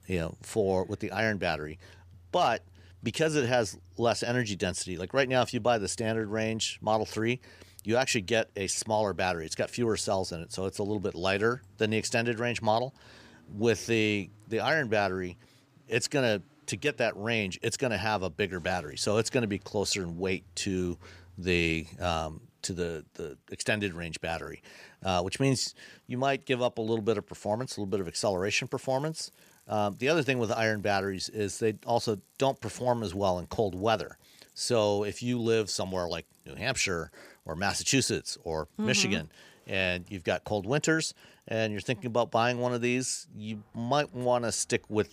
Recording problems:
traffic noise; faint; throughout; 30 dB below the speech

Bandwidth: 15 kHz